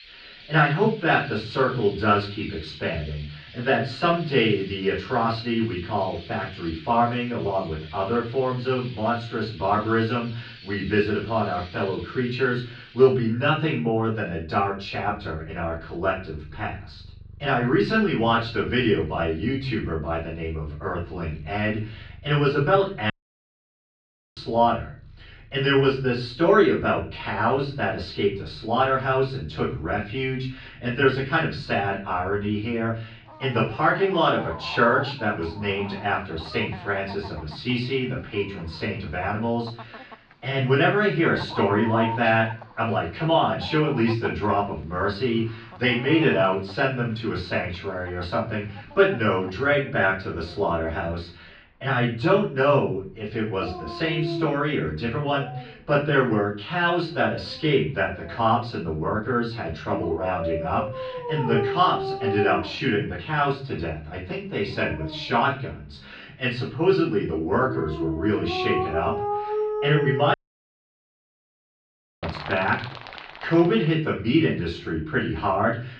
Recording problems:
off-mic speech; far
room echo; slight; dies away in 0.4 s
muffled; very slightly; fading above 4.5 kHz
animal sounds; noticeable; throughout; 10 dB below the speech
audio cutting out; at 23 s for 1.5 s and at 1:10 for 2 s

